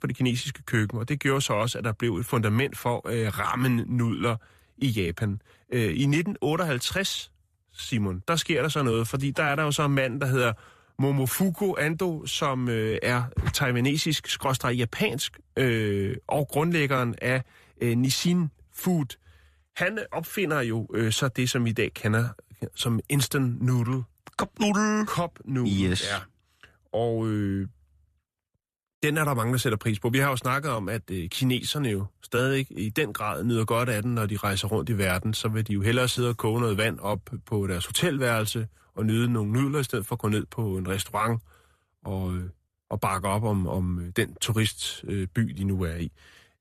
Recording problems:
none

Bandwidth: 14.5 kHz